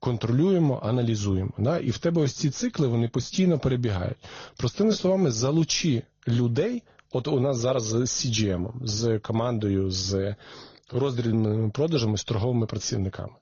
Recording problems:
garbled, watery; slightly; nothing above 6.5 kHz

